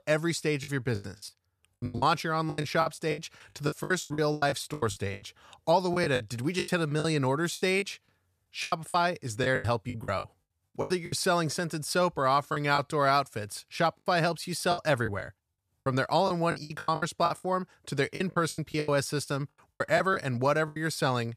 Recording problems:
choppy; very; 16% of the speech affected

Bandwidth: 14.5 kHz